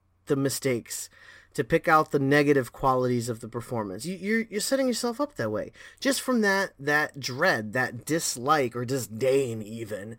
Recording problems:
none

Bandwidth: 16 kHz